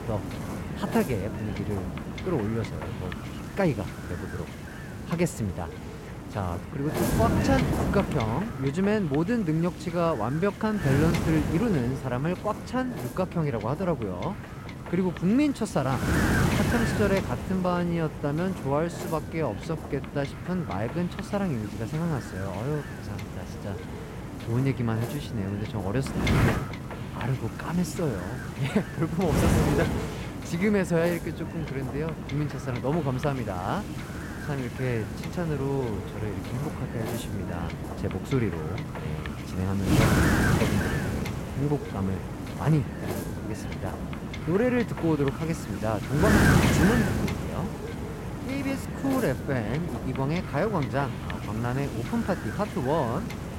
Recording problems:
wind noise on the microphone; heavy; 3 dB below the speech

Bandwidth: 16 kHz